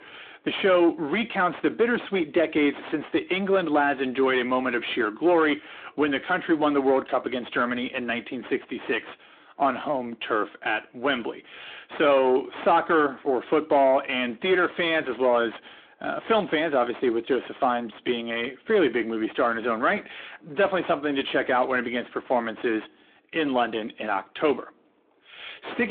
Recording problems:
phone-call audio; nothing above 3.5 kHz
distortion; slight; 10 dB below the speech
abrupt cut into speech; at the end

